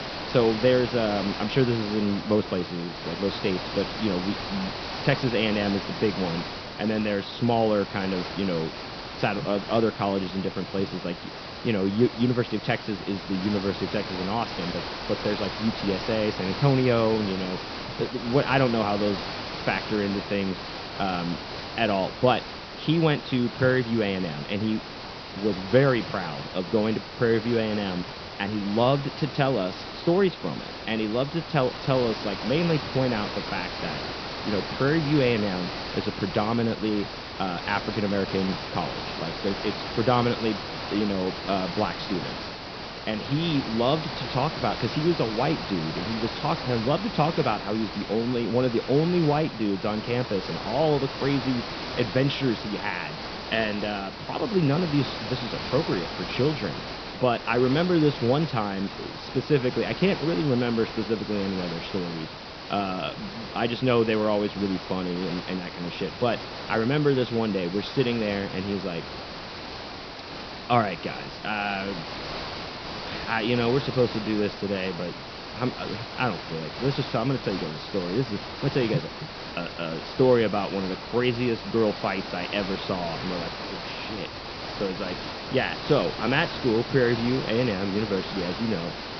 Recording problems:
high frequencies cut off; noticeable; nothing above 5.5 kHz
hiss; loud; throughout; 7 dB below the speech

